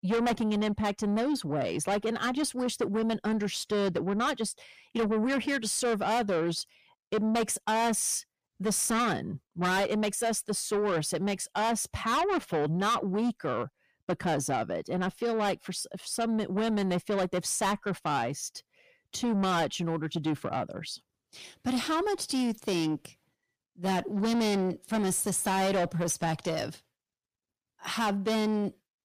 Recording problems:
distortion; heavy; 7 dB below the speech

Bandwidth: 15 kHz